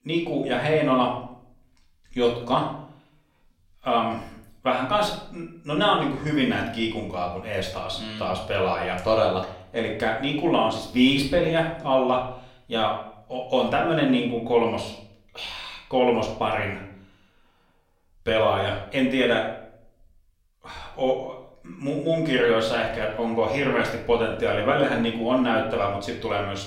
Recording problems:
off-mic speech; far
room echo; slight; dies away in 0.5 s

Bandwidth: 16.5 kHz